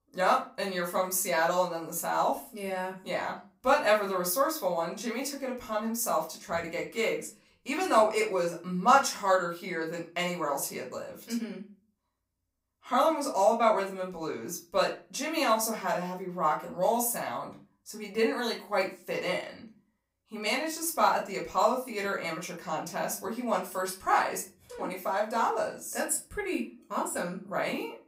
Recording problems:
off-mic speech; far
room echo; very slight; dies away in 0.3 s

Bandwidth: 15.5 kHz